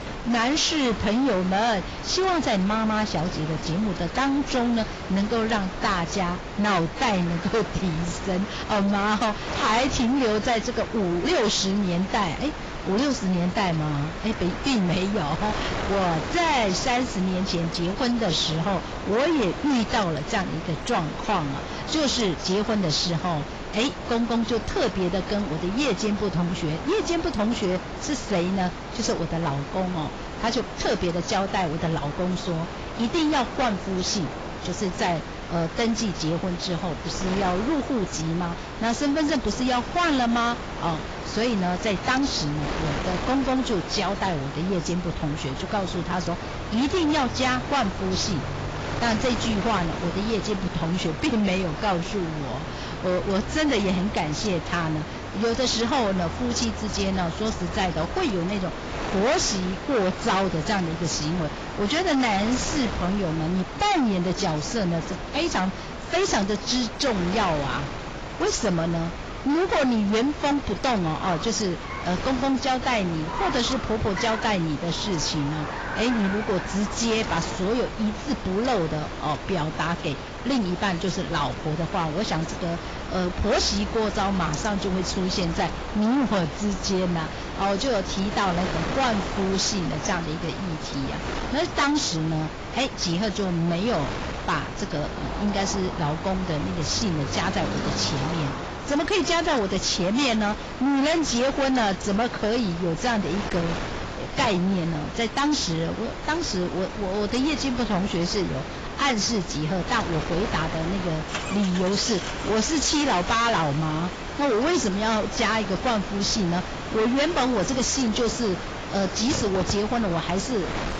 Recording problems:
distortion; heavy; 16% of the sound clipped
garbled, watery; badly; nothing above 7.5 kHz
wind noise on the microphone; heavy; 9 dB below the speech
traffic noise; noticeable; throughout; 15 dB below the speech

